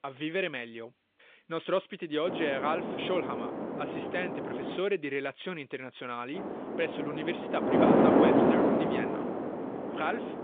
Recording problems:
phone-call audio; nothing above 3.5 kHz
wind noise on the microphone; heavy; from 2.5 to 5 s and from 6.5 s on; 4 dB above the speech

